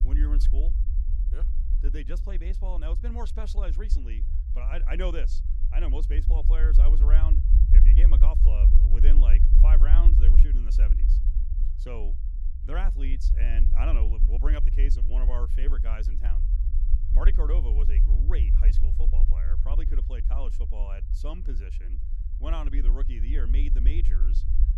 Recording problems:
low rumble; loud; throughout; 6 dB below the speech

